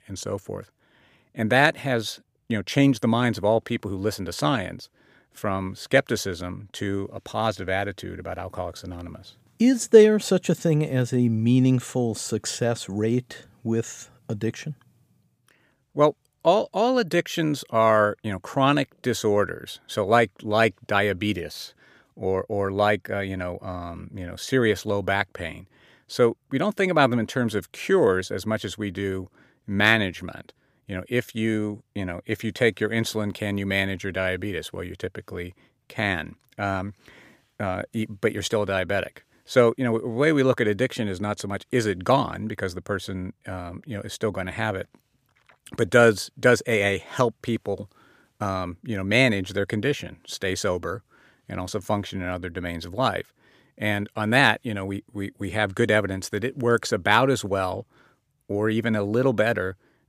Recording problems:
none

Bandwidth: 15 kHz